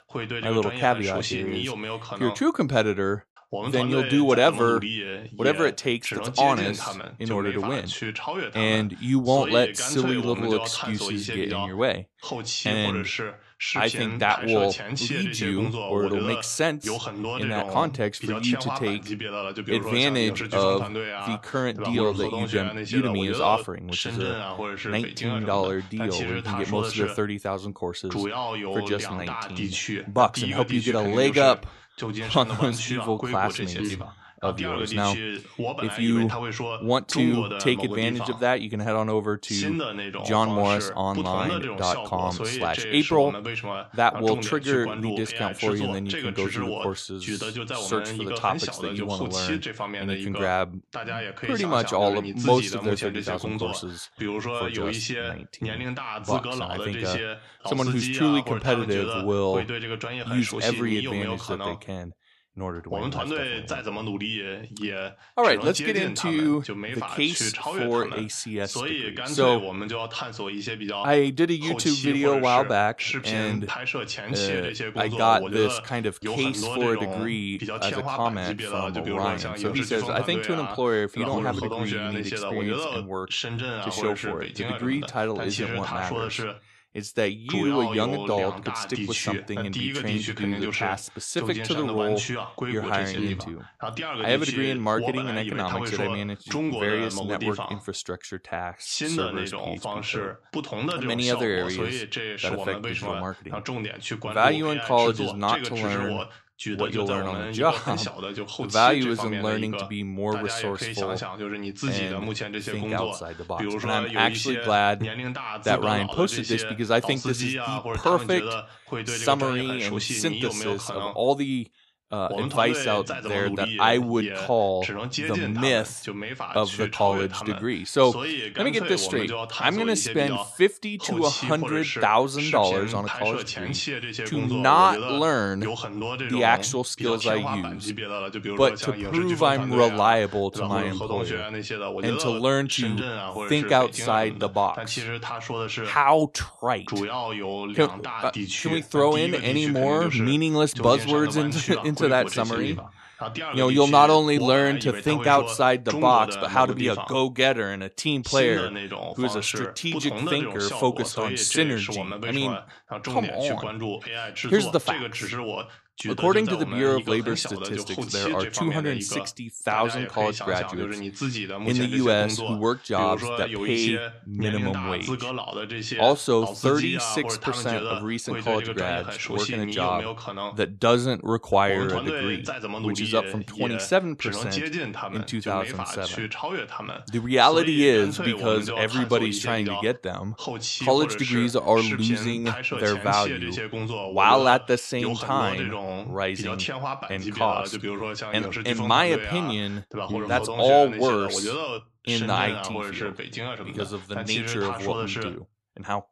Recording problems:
voice in the background; loud; throughout; 5 dB below the speech

